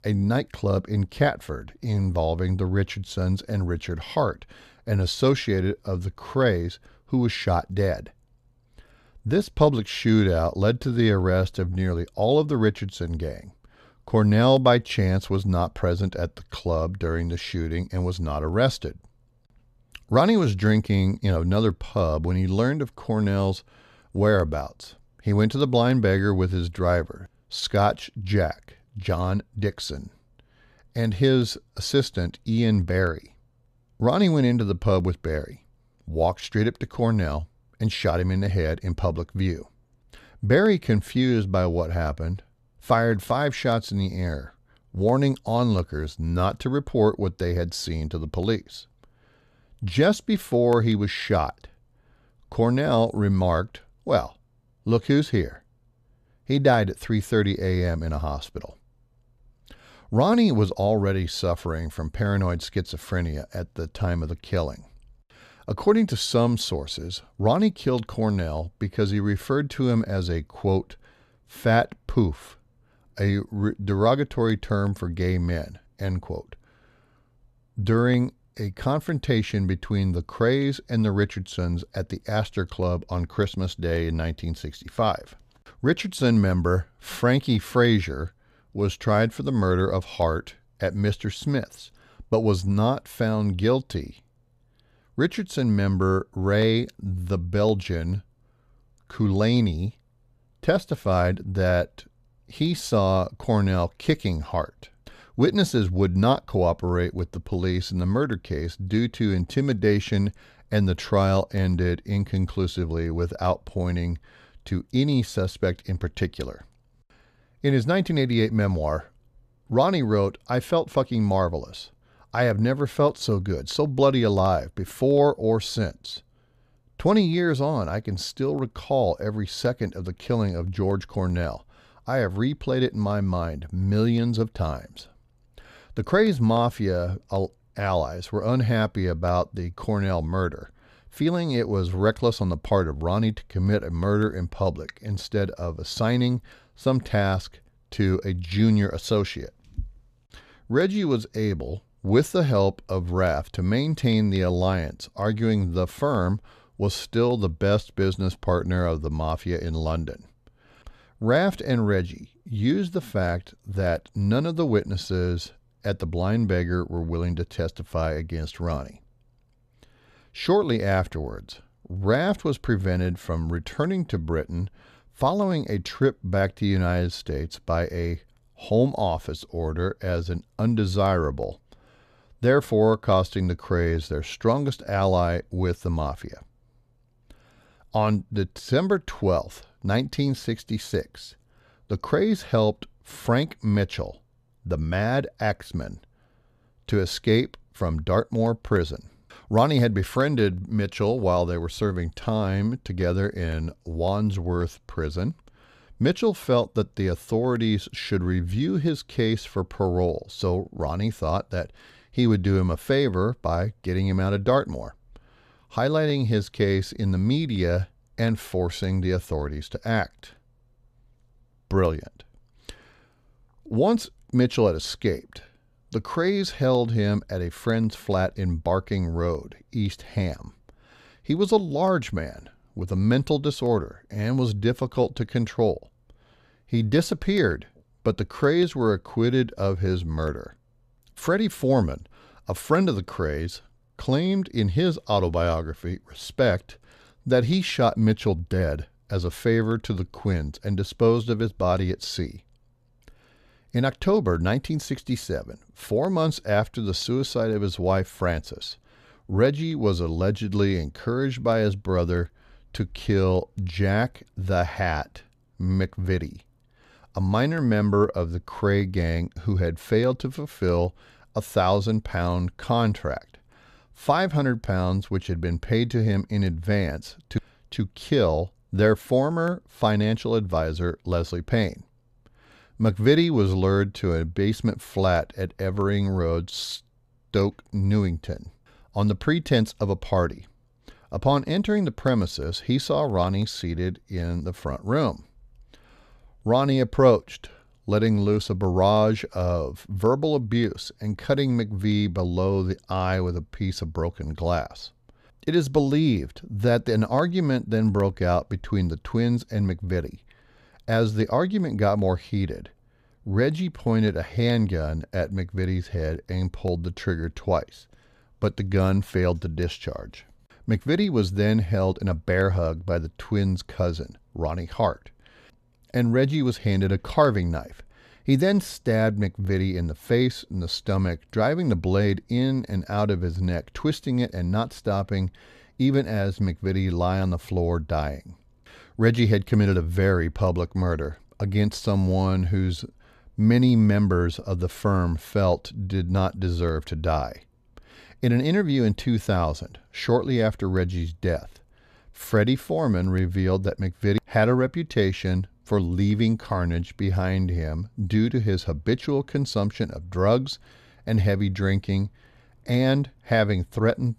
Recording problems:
none

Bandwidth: 14.5 kHz